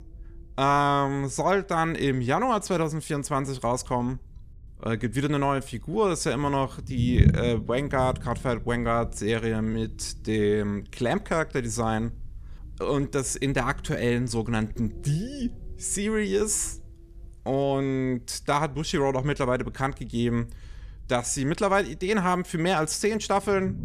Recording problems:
low rumble; noticeable; throughout; 20 dB below the speech

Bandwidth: 14.5 kHz